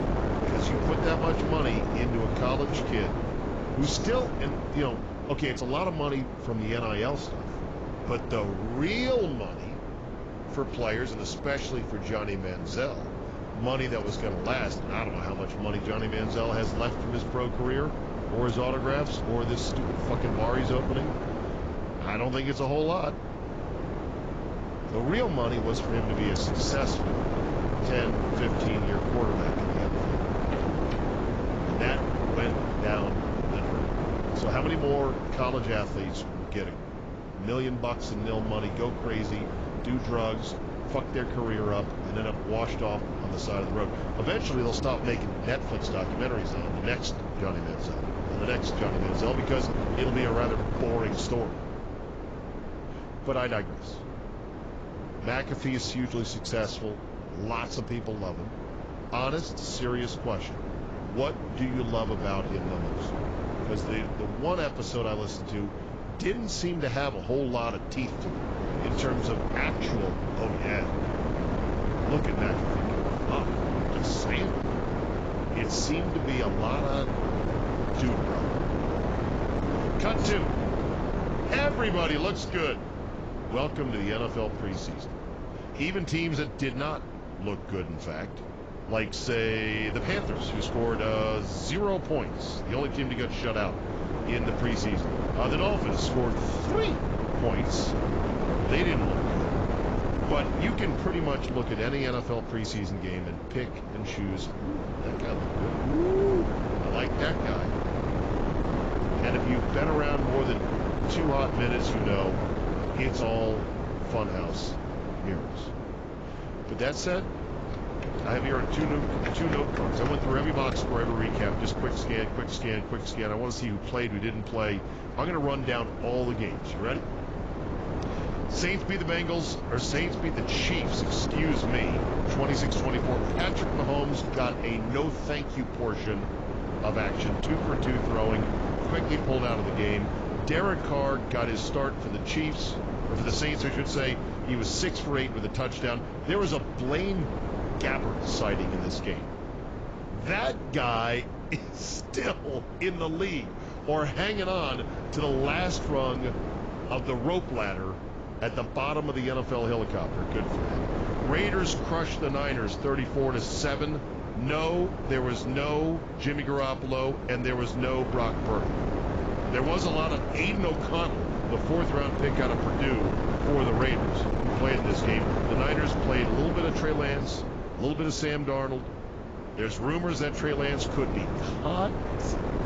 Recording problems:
garbled, watery; badly; nothing above 7.5 kHz
wind noise on the microphone; heavy; 3 dB below the speech

